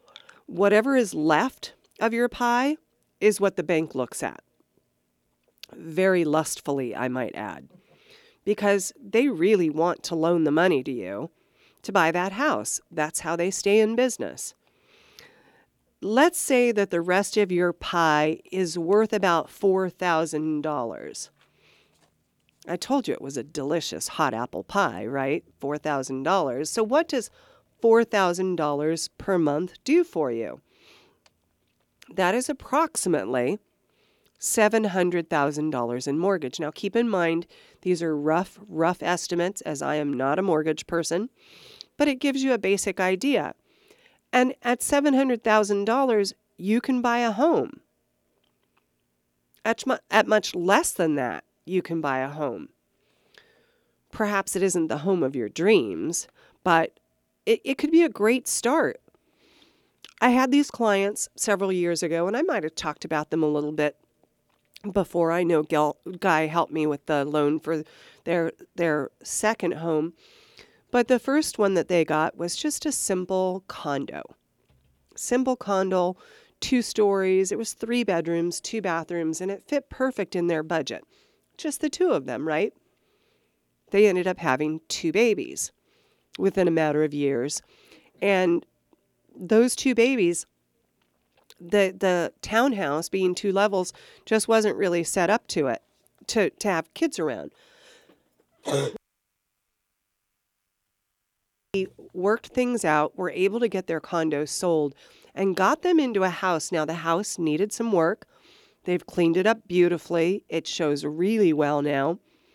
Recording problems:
none

